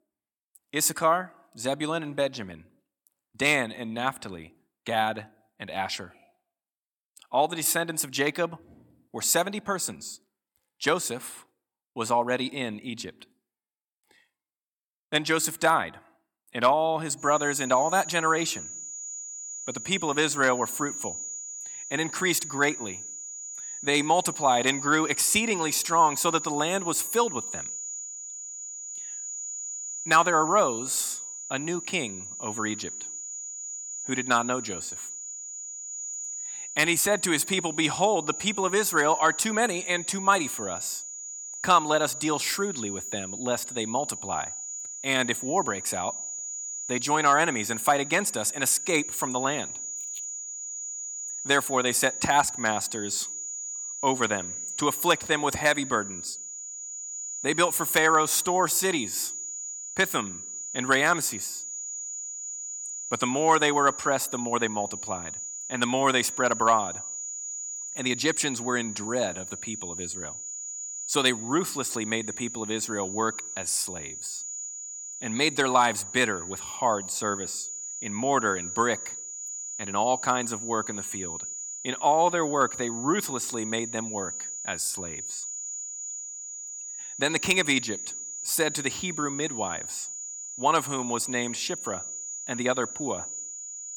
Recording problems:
high-pitched whine; loud; from 17 s on; 7 kHz, 8 dB below the speech

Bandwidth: 18 kHz